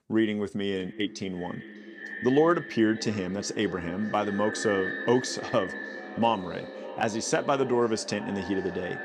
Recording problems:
echo of what is said; strong; throughout; 600 ms later, 10 dB below the speech

